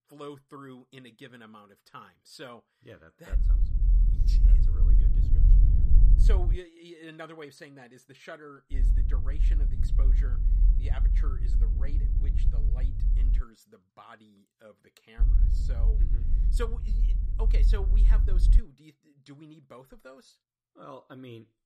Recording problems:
low rumble; loud; from 3.5 to 6.5 s, from 8.5 to 13 s and from 15 to 19 s; 2 dB below the speech

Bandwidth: 14.5 kHz